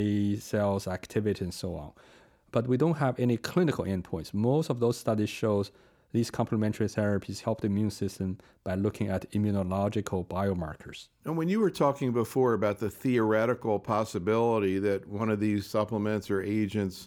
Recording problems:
abrupt cut into speech; at the start

